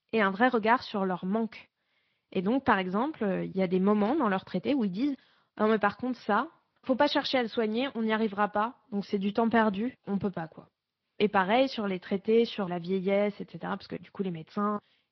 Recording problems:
high frequencies cut off; noticeable; nothing above 5.5 kHz
garbled, watery; slightly

